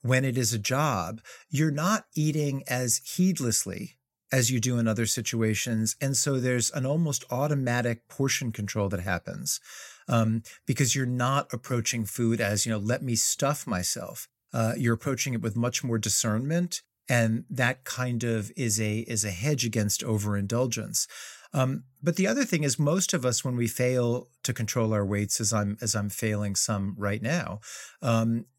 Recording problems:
none

